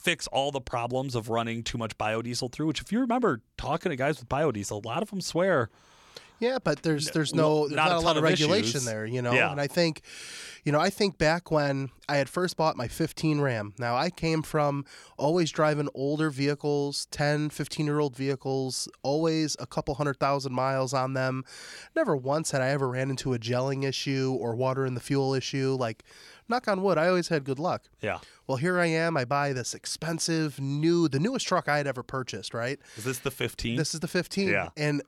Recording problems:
none

